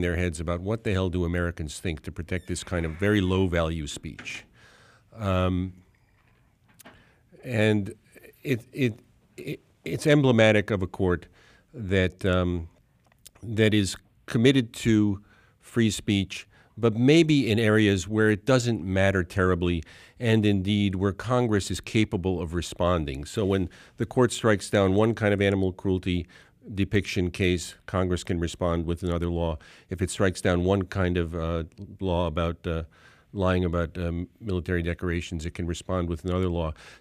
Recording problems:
abrupt cut into speech; at the start

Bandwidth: 15 kHz